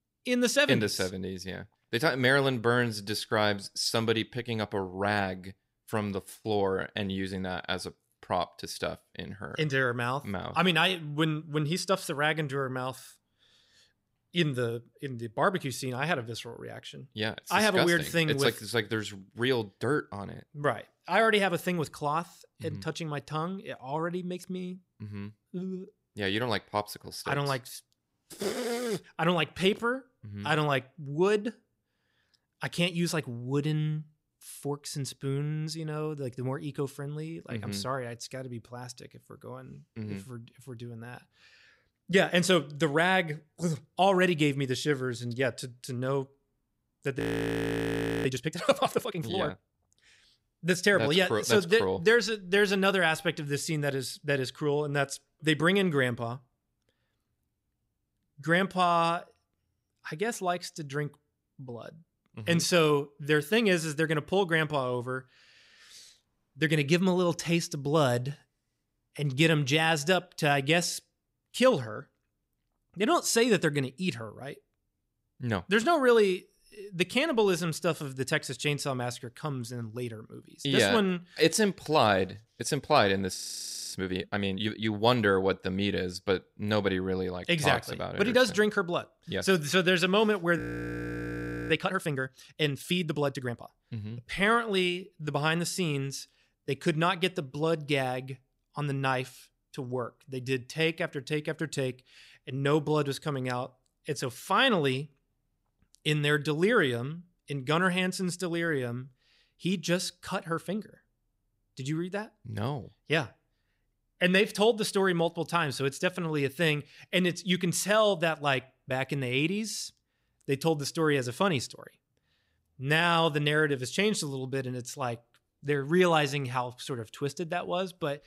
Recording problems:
audio freezing; at 47 s for 1 s, at 1:23 for 0.5 s and at 1:31 for 1 s

